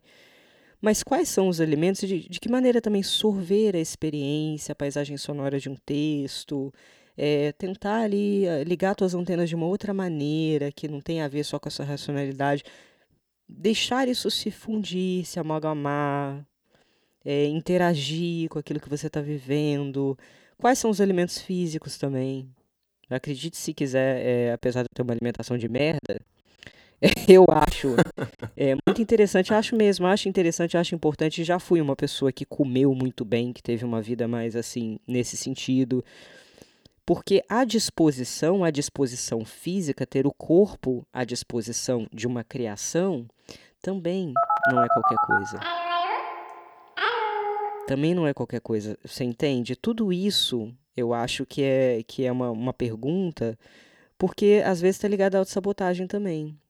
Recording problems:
choppy; very; from 25 to 29 s; 16% of the speech affected
phone ringing; loud; from 44 to 48 s; peak 4 dB above the speech

